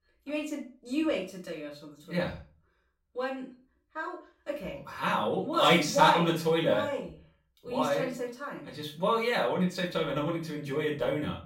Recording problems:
off-mic speech; far
room echo; slight; dies away in 0.3 s

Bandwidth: 16 kHz